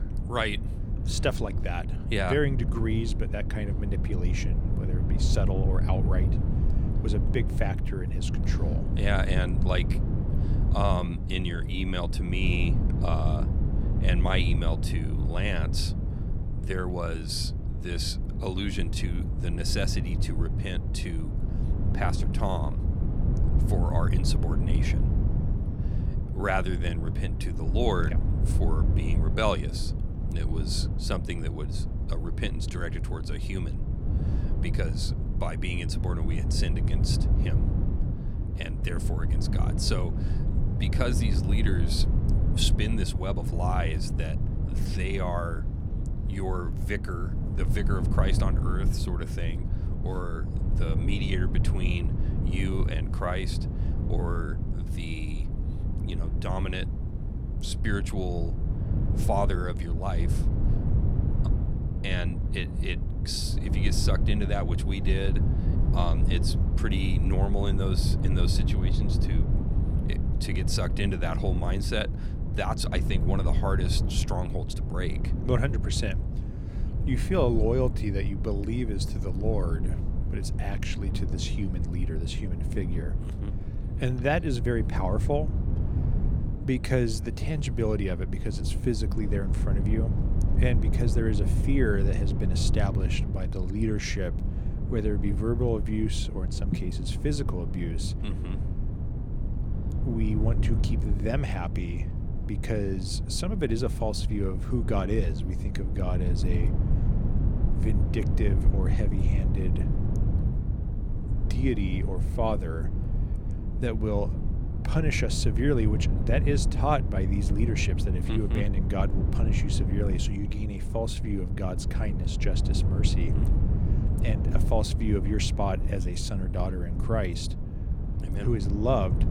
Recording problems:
wind noise on the microphone; heavy; 7 dB below the speech

